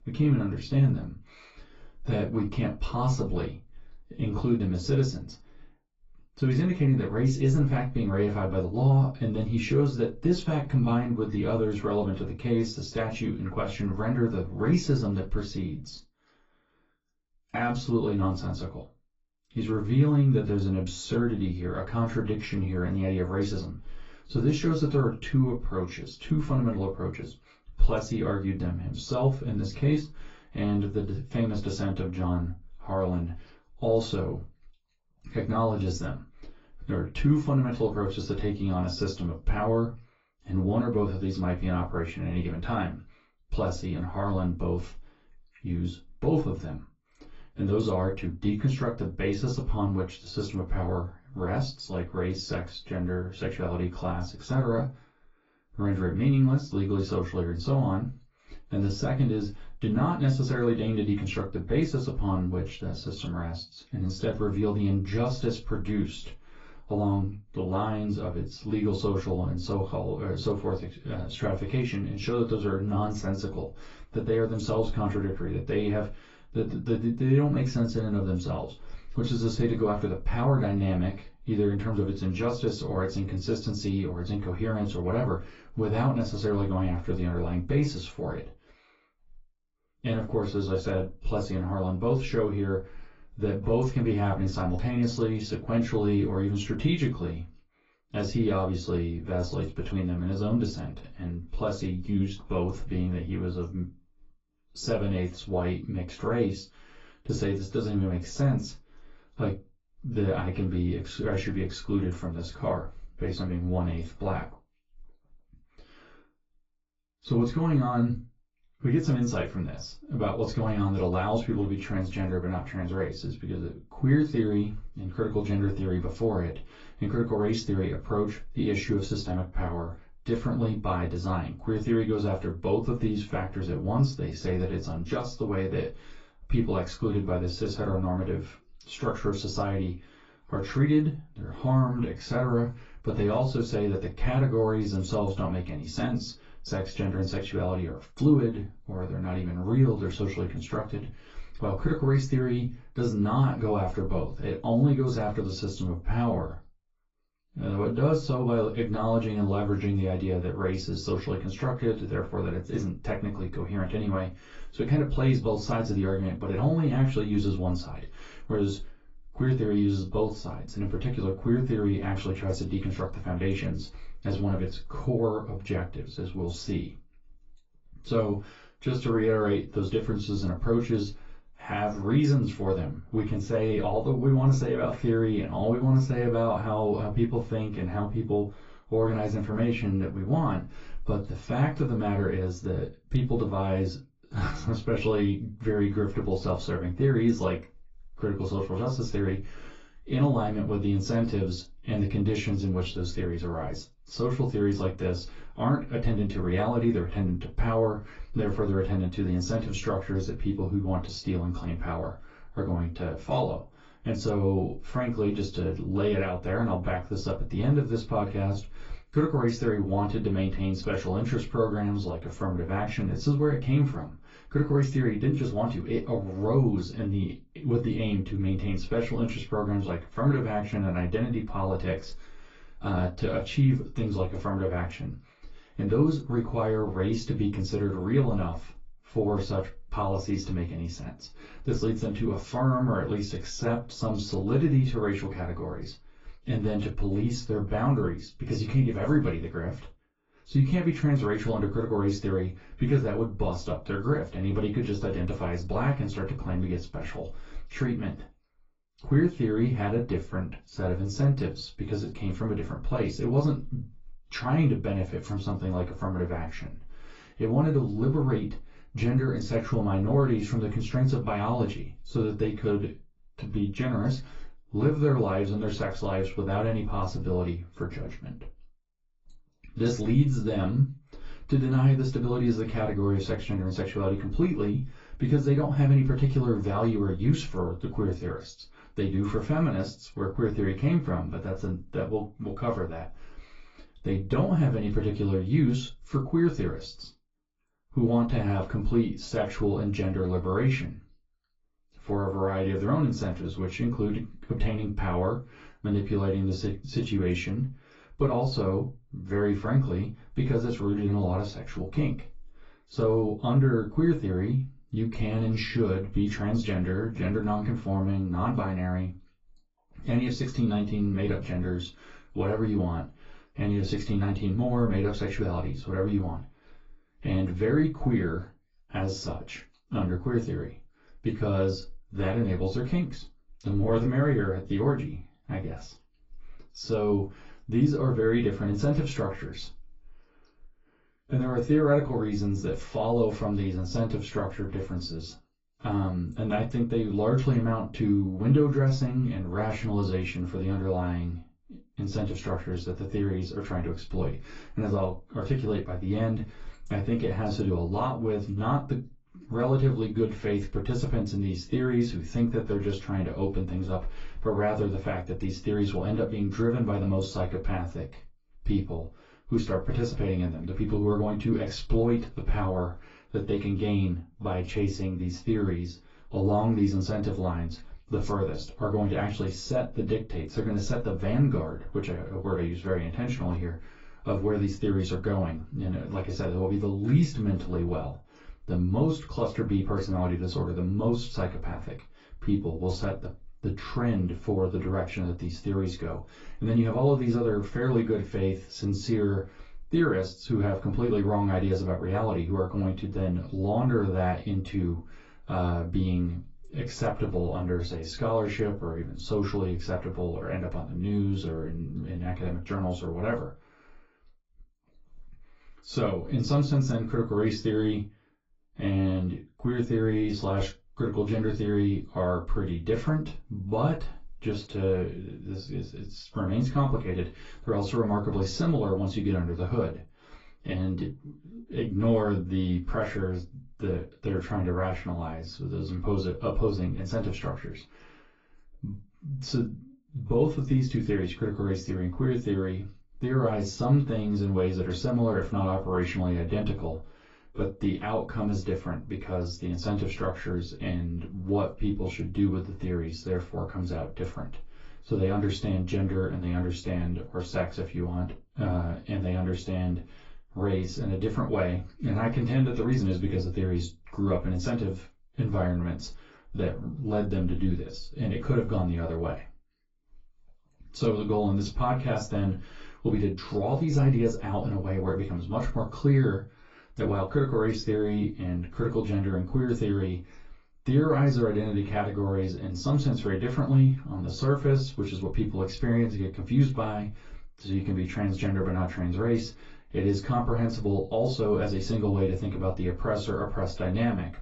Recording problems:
off-mic speech; far
garbled, watery; badly; nothing above 7.5 kHz
room echo; very slight; dies away in 0.2 s

